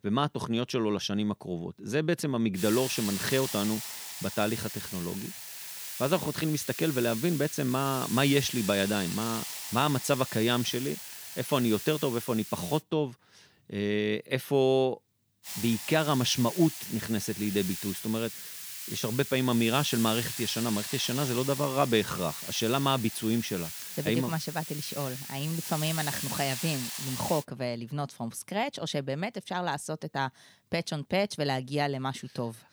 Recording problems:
hiss; loud; from 2.5 to 13 s and from 15 to 27 s; 7 dB below the speech

